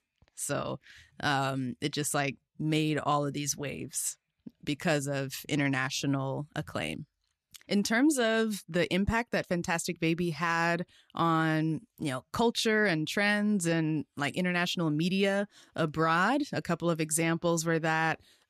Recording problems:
none

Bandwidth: 14 kHz